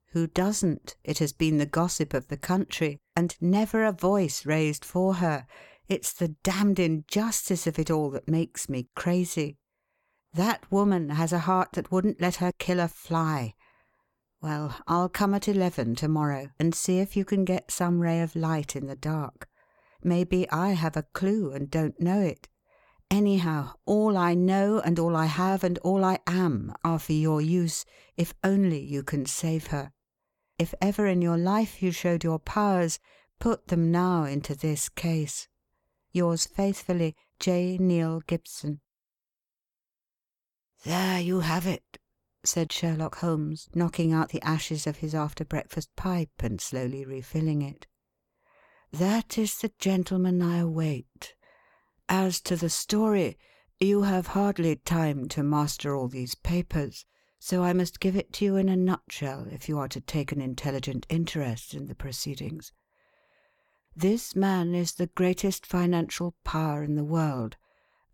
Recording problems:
none

